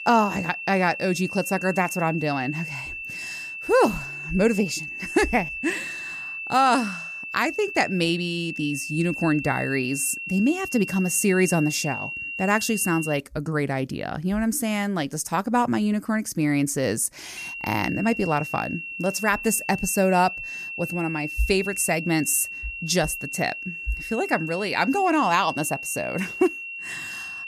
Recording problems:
high-pitched whine; loud; until 13 s and from 17 s on; 2.5 kHz, 8 dB below the speech

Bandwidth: 14.5 kHz